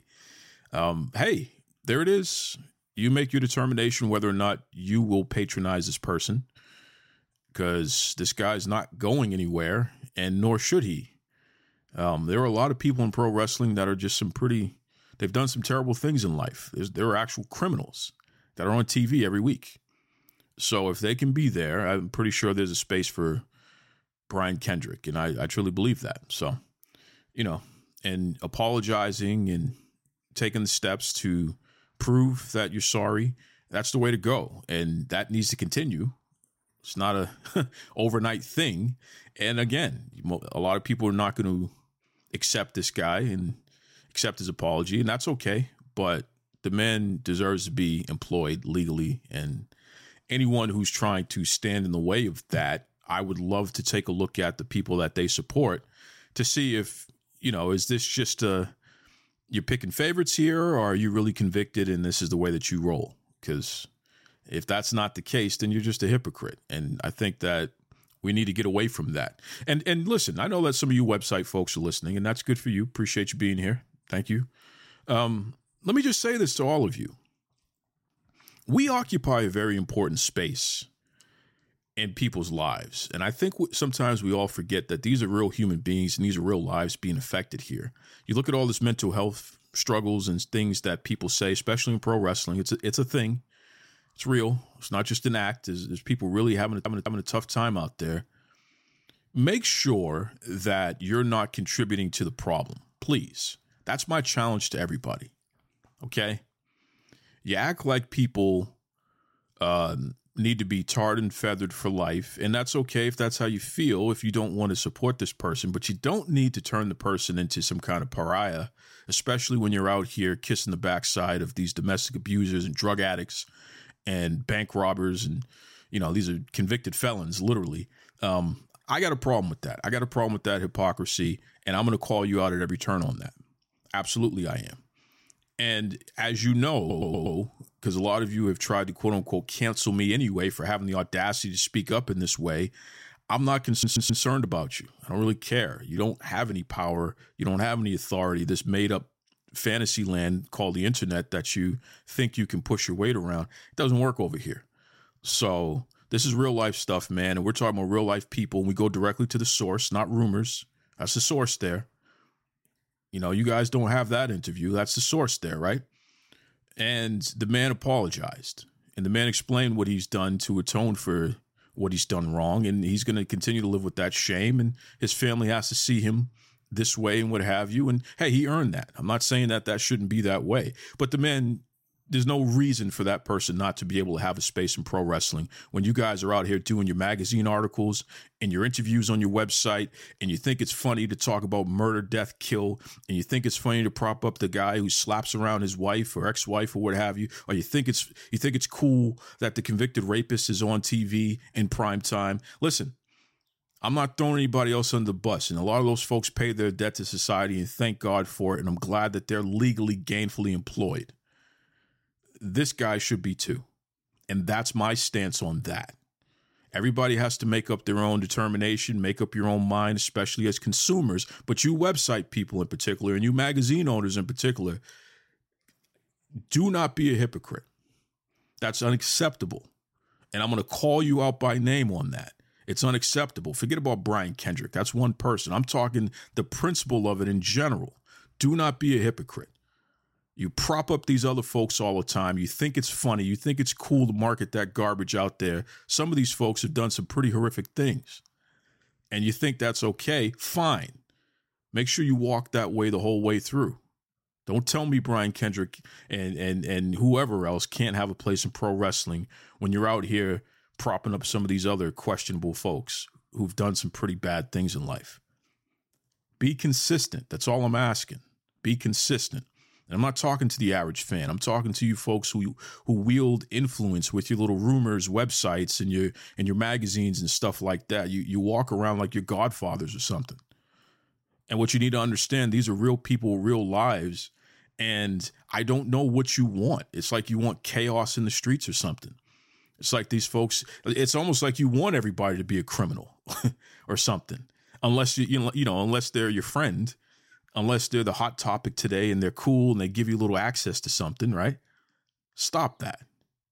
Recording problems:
audio stuttering; at 1:37, at 2:17 and at 2:24

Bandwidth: 16 kHz